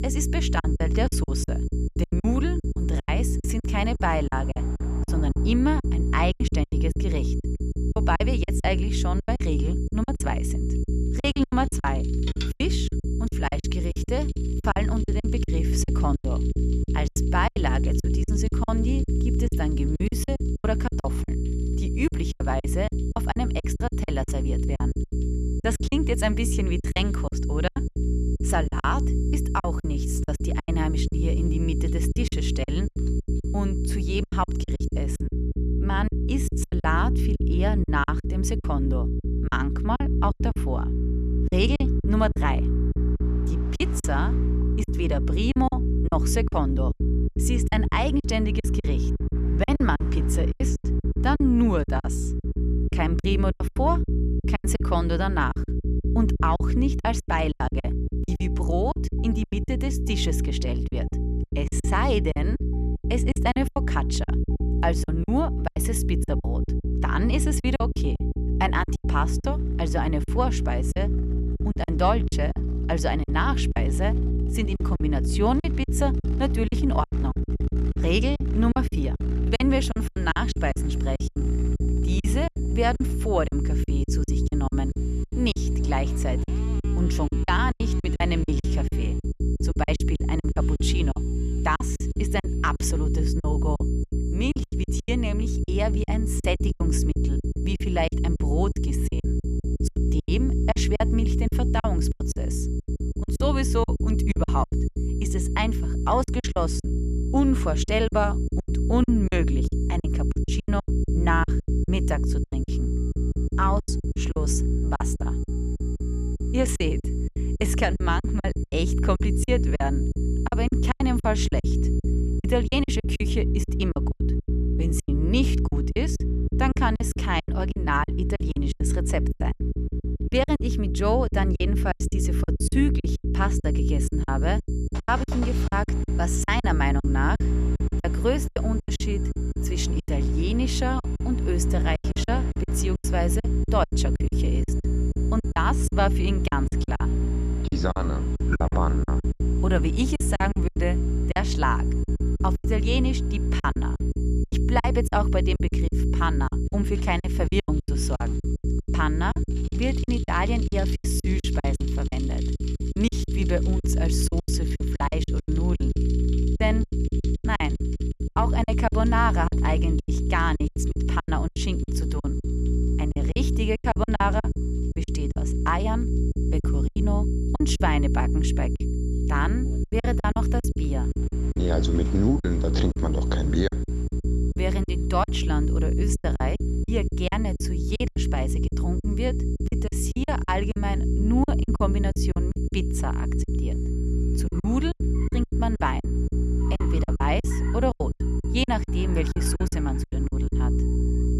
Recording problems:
electrical hum; loud; throughout; 60 Hz, 8 dB below the speech
high-pitched whine; faint; until 35 s, from 1:20 to 2:03 and from 2:13 on; 7.5 kHz, 25 dB below the speech
traffic noise; faint; throughout; 20 dB below the speech
choppy; very; 15% of the speech affected

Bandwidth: 14 kHz